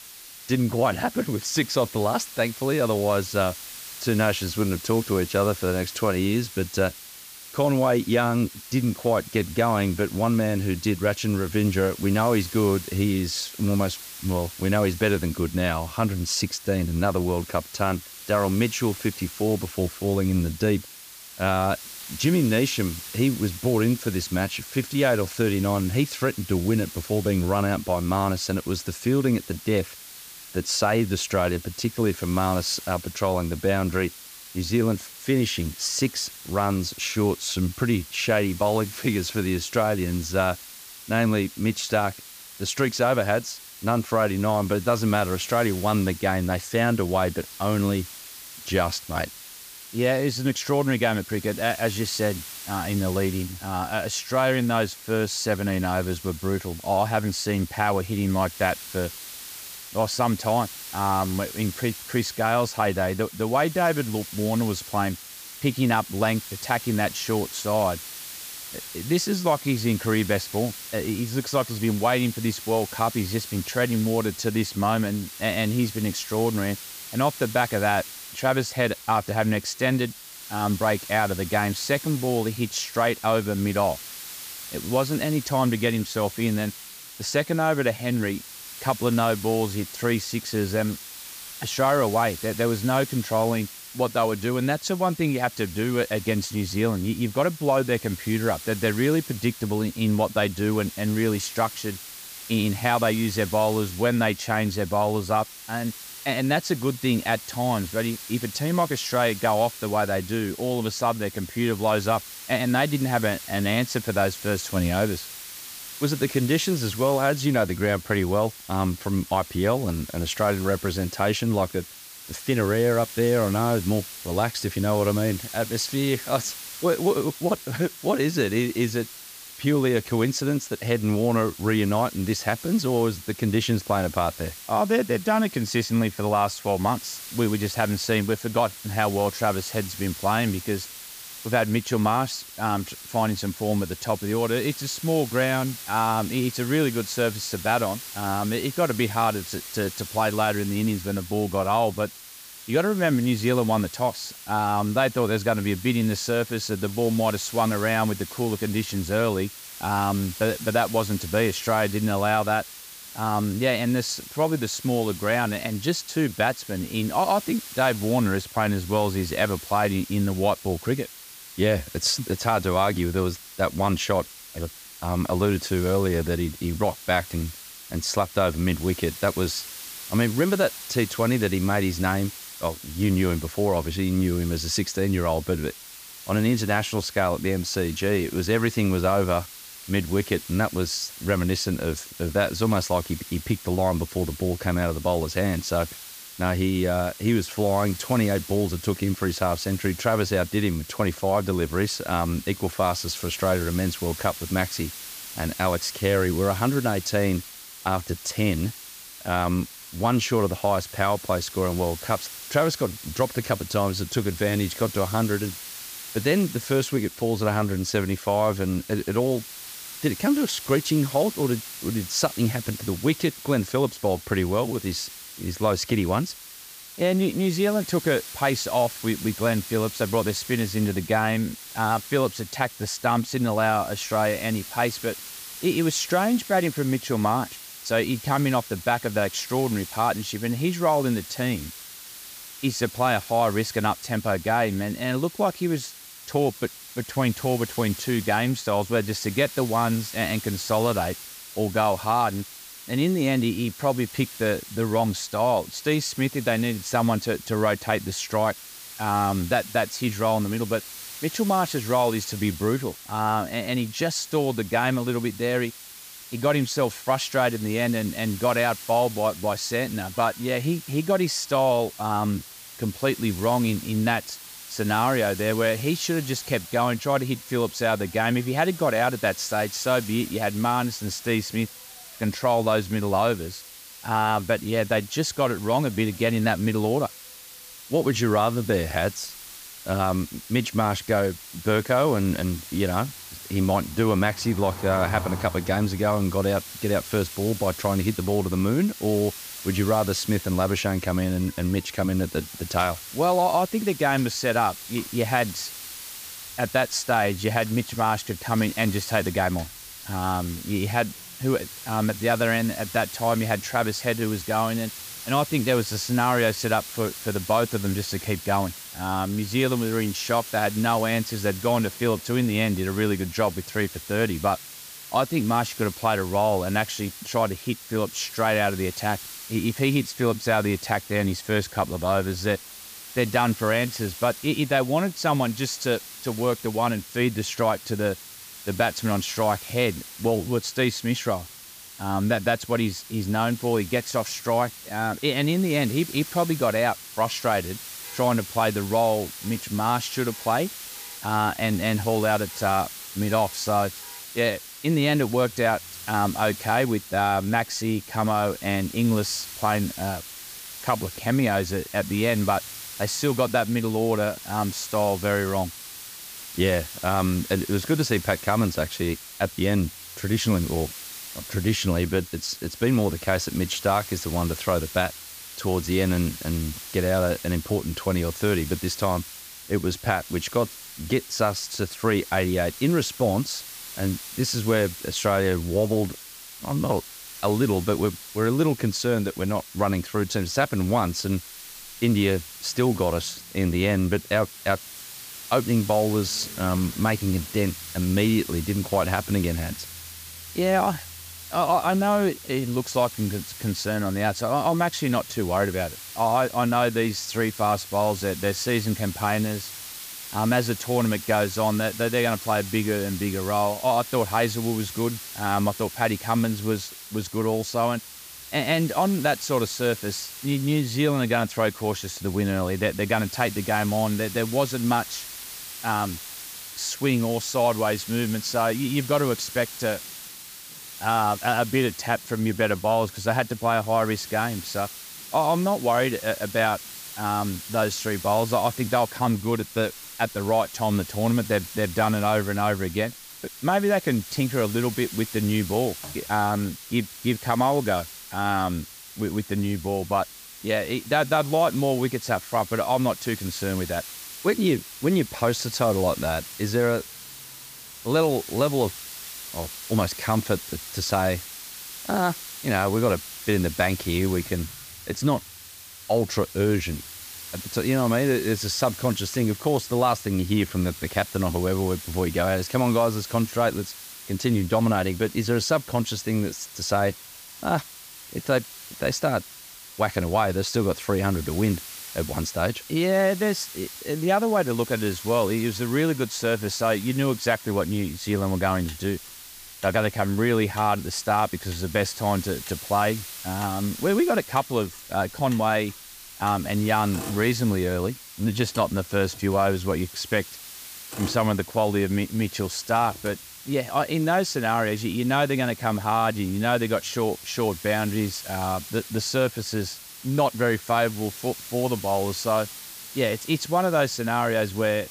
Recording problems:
hiss; noticeable; throughout; 15 dB below the speech
traffic noise; faint; from 4:28 on; 25 dB below the speech

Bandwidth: 15 kHz